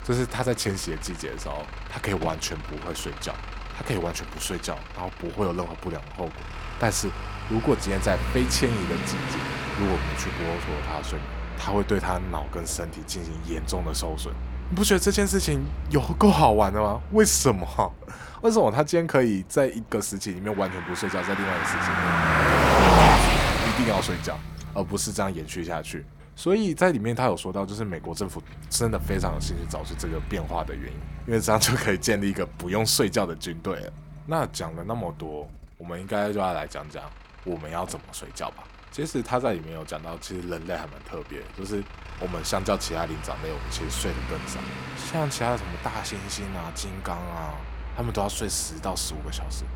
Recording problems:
traffic noise; loud; throughout; 2 dB below the speech

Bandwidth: 17 kHz